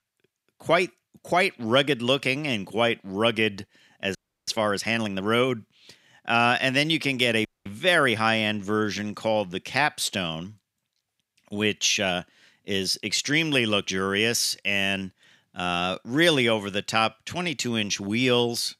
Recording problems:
audio freezing; at 4 s and at 7.5 s

